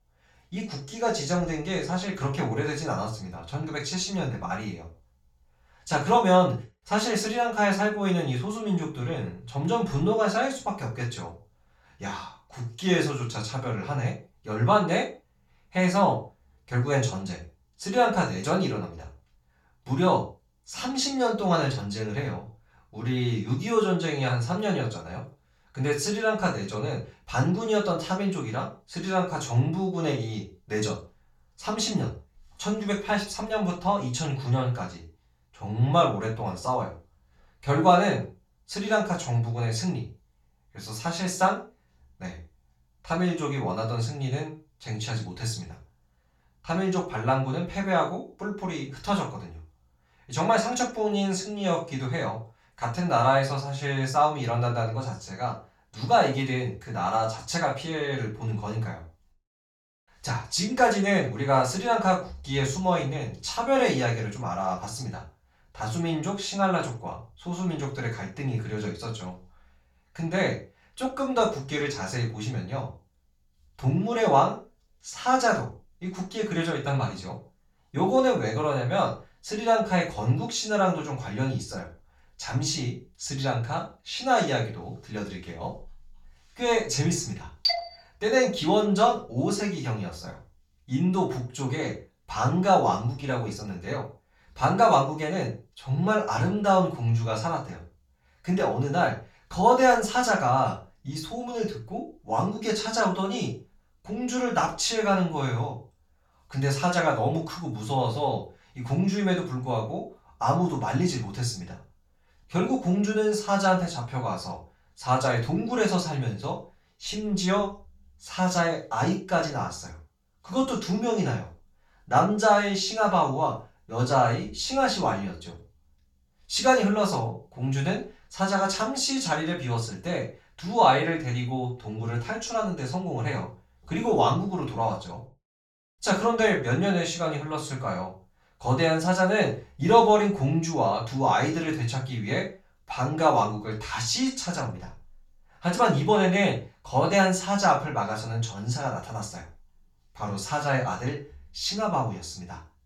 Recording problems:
off-mic speech; far
room echo; slight; dies away in 0.3 s

